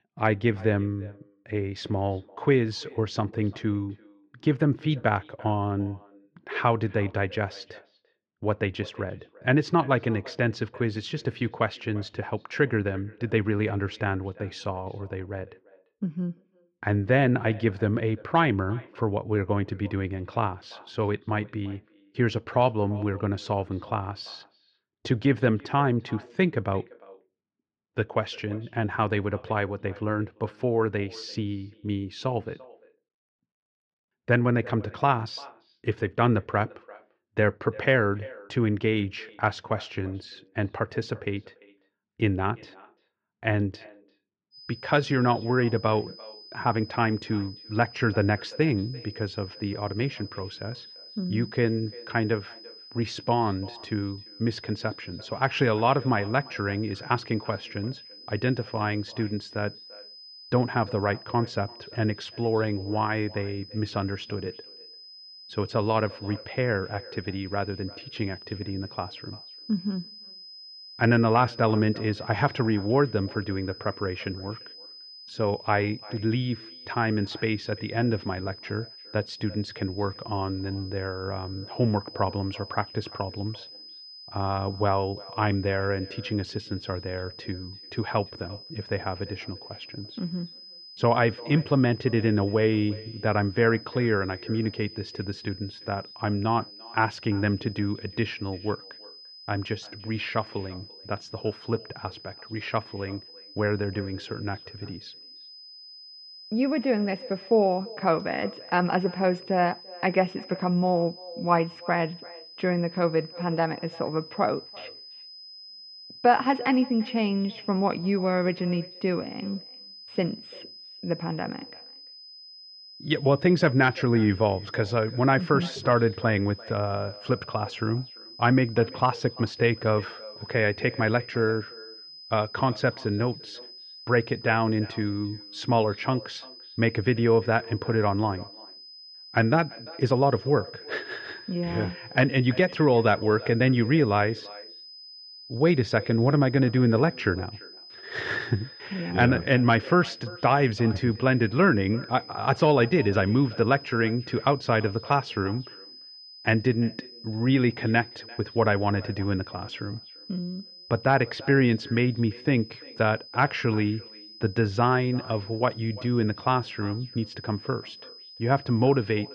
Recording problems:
muffled; very; fading above 3 kHz
echo of what is said; faint; throughout; 340 ms later, 20 dB below the speech
high-pitched whine; noticeable; from 45 s on; 5 kHz, 15 dB below the speech

